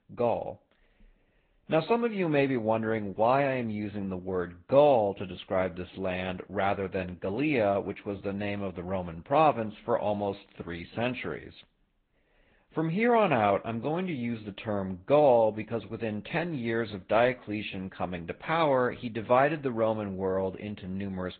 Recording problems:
high frequencies cut off; severe; nothing above 4 kHz
garbled, watery; slightly

